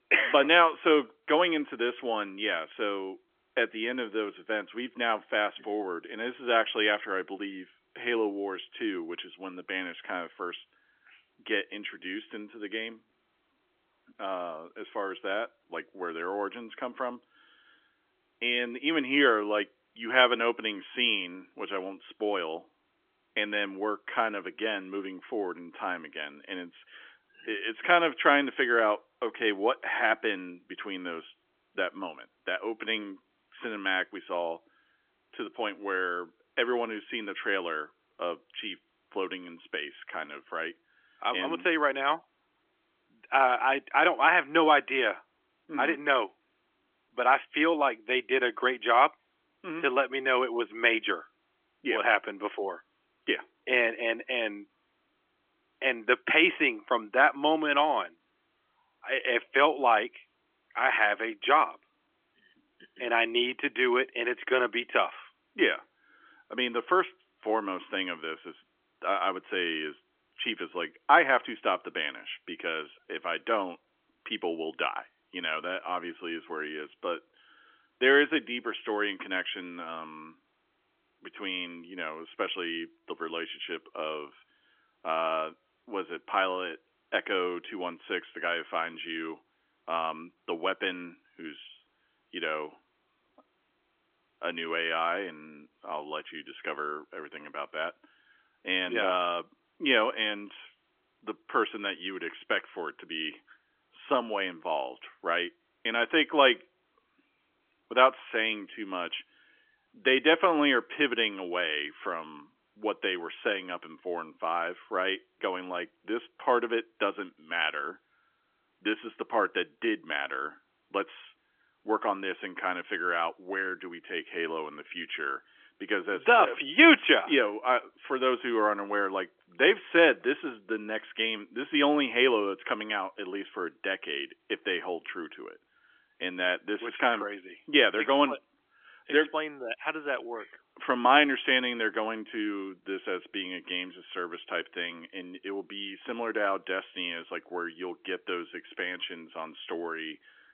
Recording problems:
phone-call audio; nothing above 3.5 kHz

